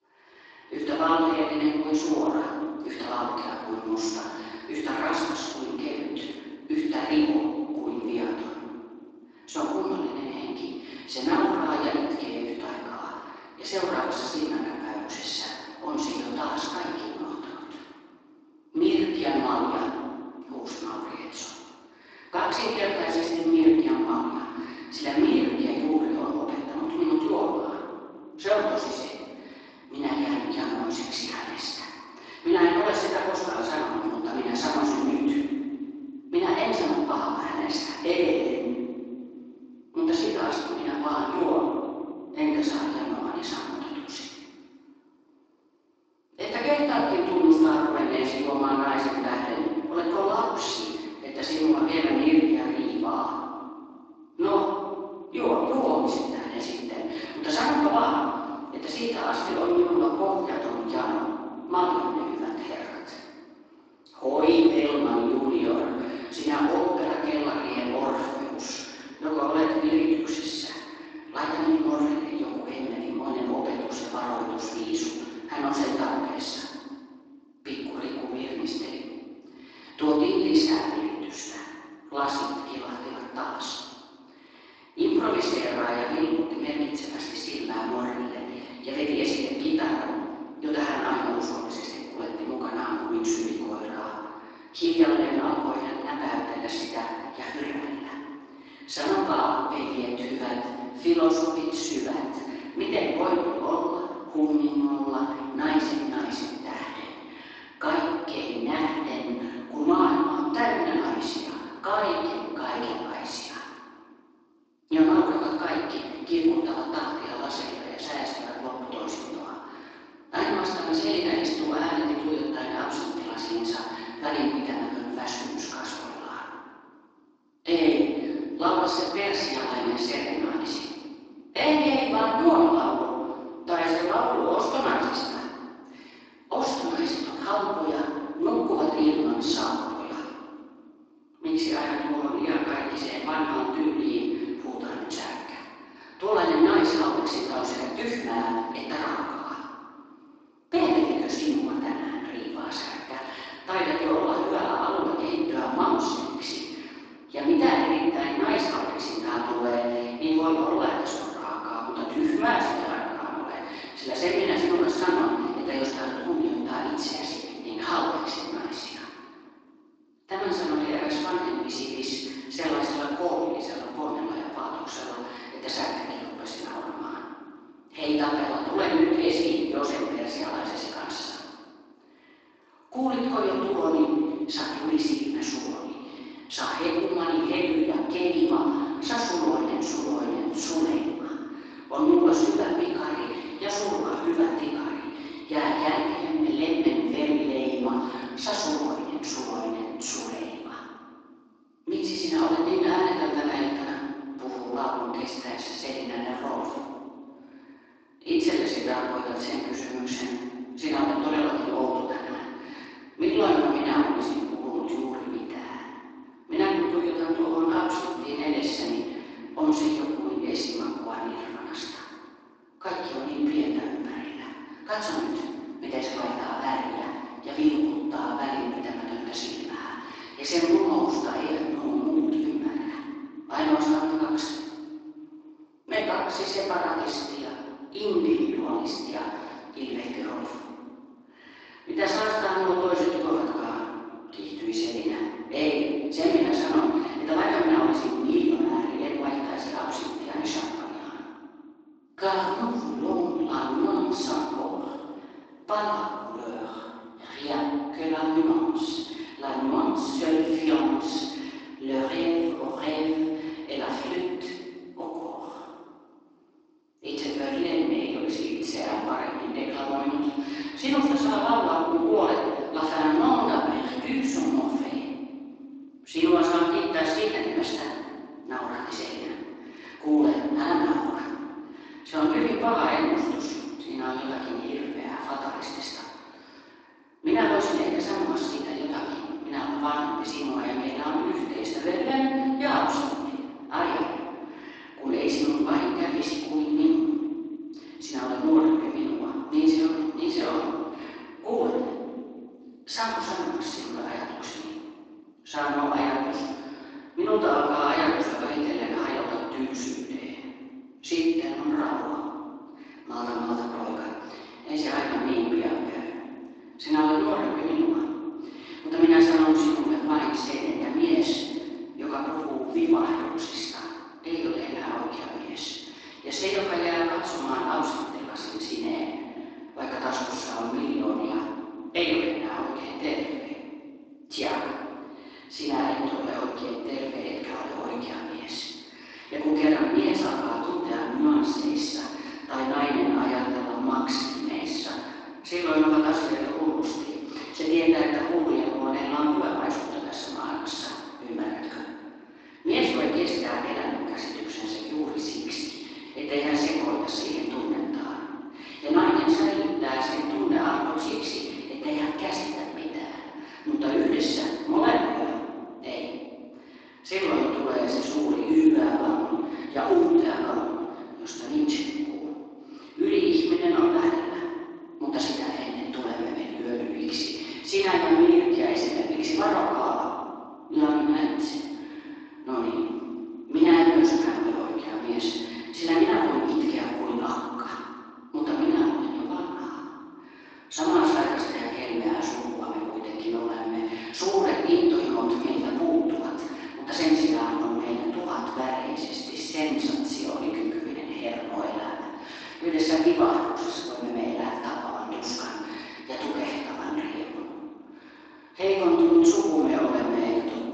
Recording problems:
room echo; strong; dies away in 2.2 s
off-mic speech; far
garbled, watery; slightly
thin; very slightly; fading below 300 Hz

